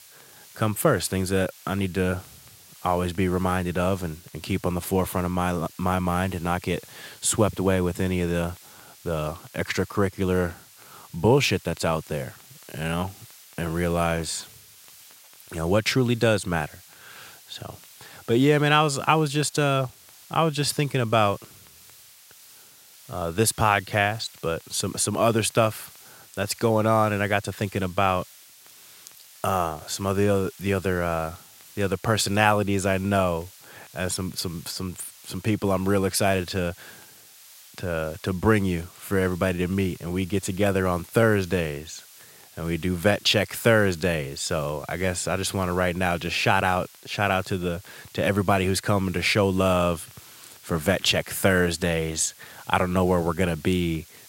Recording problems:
hiss; faint; throughout; 20 dB below the speech

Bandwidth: 16 kHz